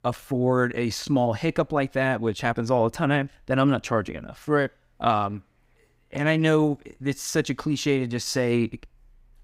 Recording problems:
none

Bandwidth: 15.5 kHz